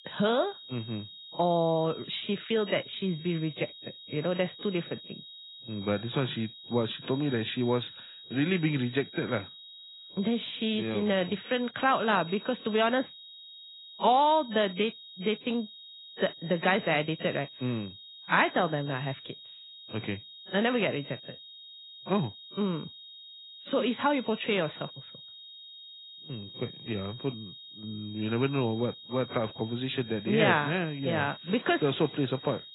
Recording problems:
garbled, watery; badly; nothing above 4 kHz
high-pitched whine; noticeable; throughout; 3.5 kHz, 15 dB below the speech

